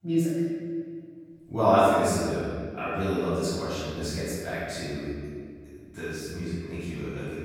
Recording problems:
room echo; strong; dies away in 1.9 s
off-mic speech; far

